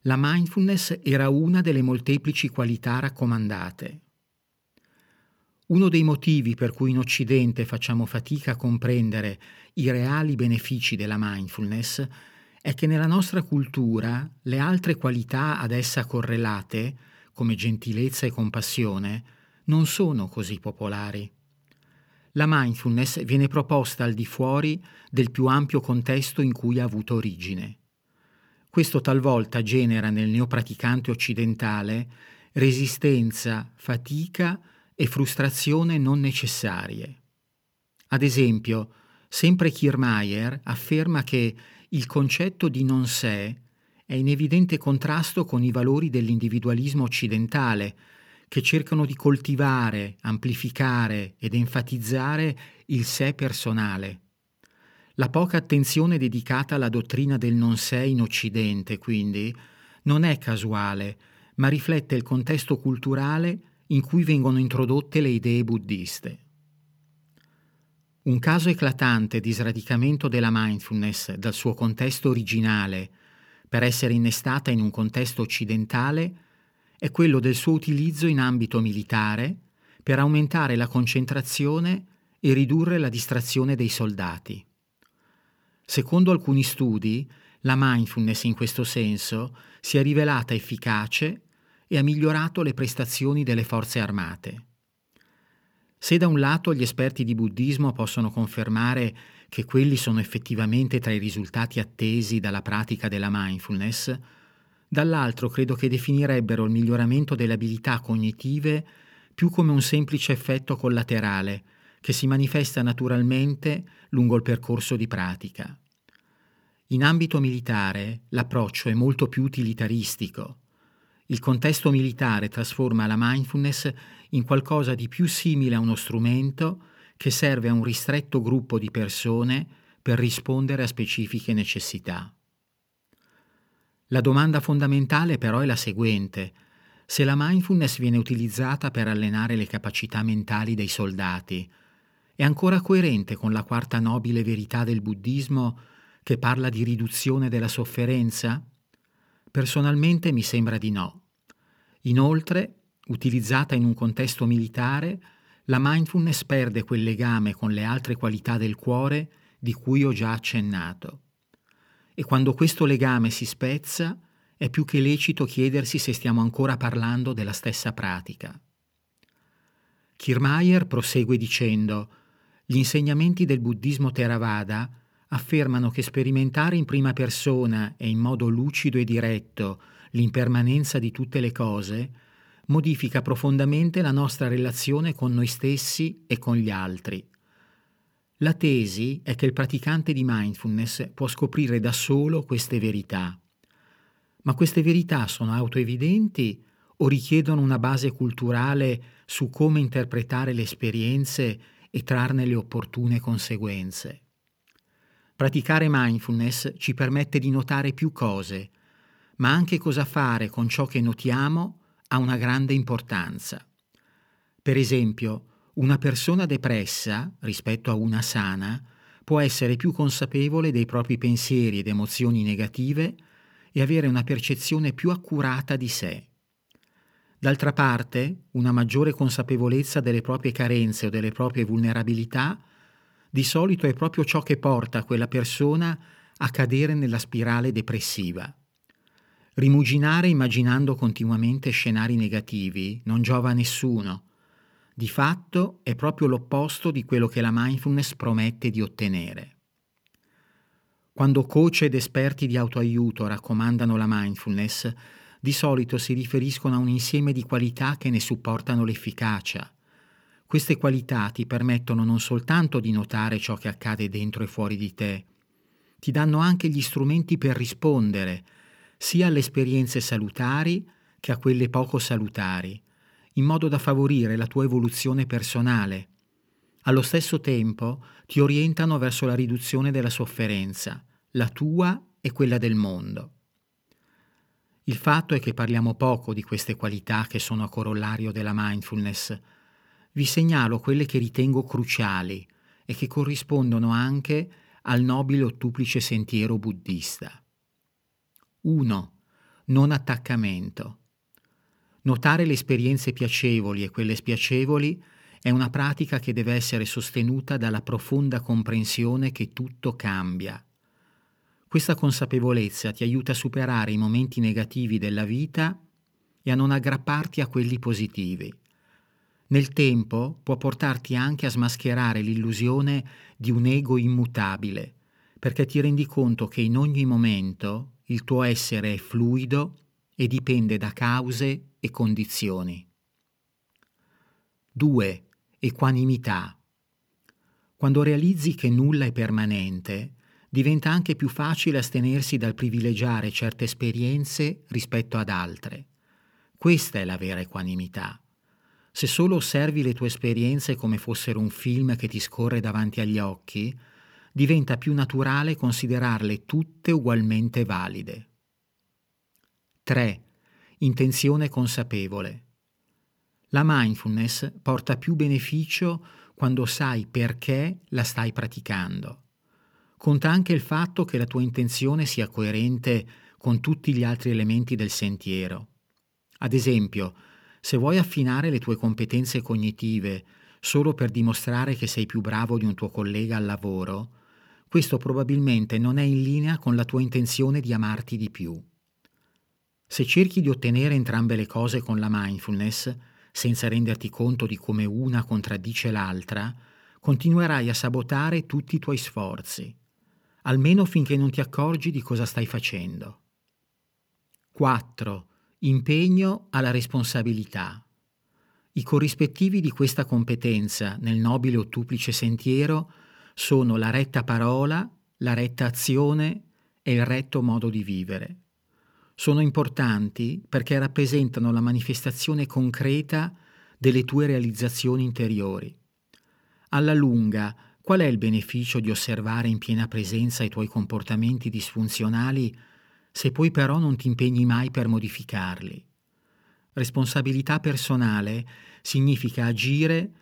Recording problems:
none

